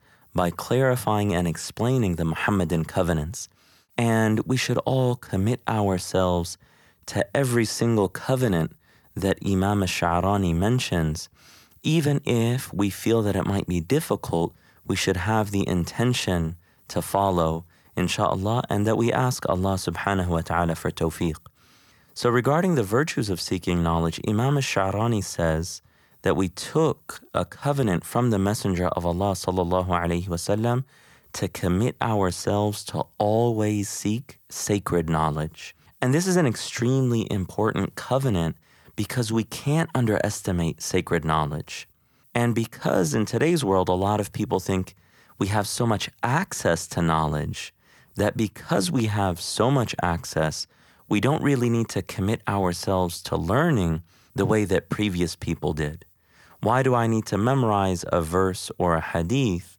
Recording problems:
none

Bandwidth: 18.5 kHz